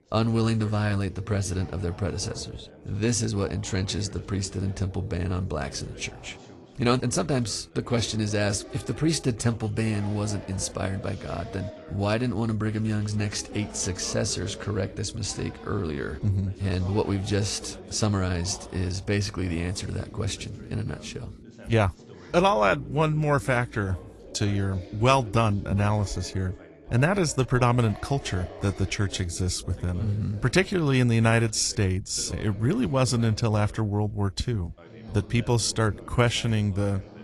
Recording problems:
garbled, watery; slightly
background chatter; noticeable; throughout; 2 voices, 20 dB below the speech

